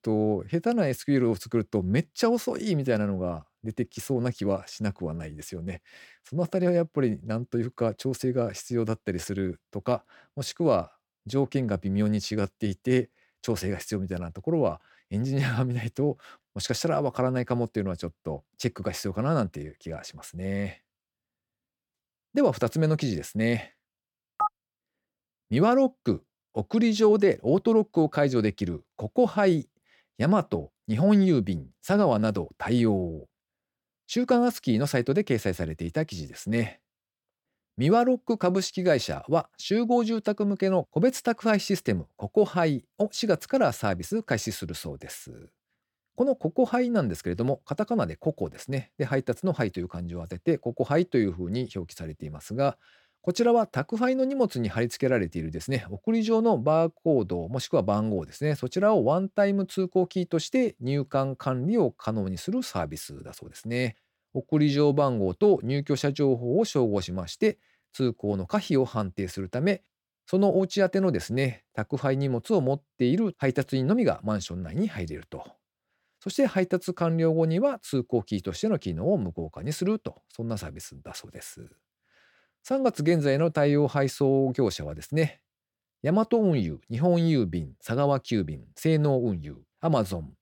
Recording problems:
none

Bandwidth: 17 kHz